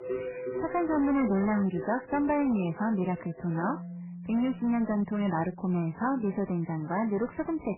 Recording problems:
garbled, watery; badly; nothing above 3 kHz
distortion; slight; 11% of the sound clipped
background music; noticeable; throughout; 10 dB below the speech

